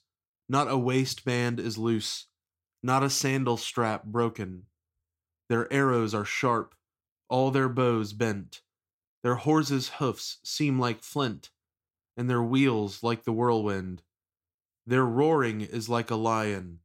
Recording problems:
none

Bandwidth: 16 kHz